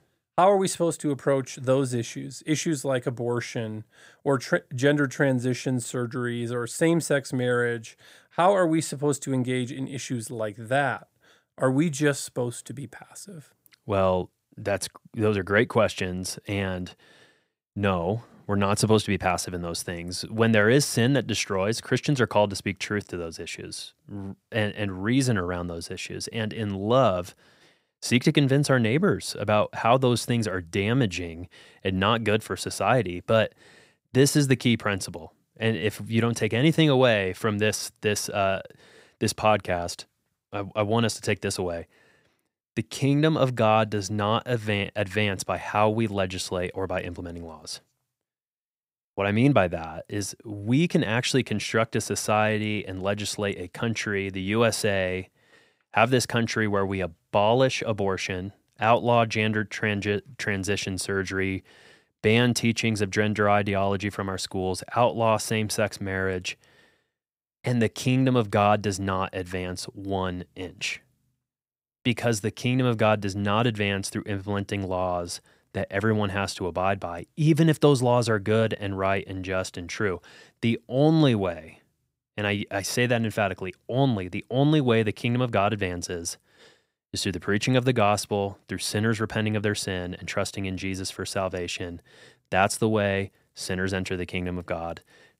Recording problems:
none

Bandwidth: 15.5 kHz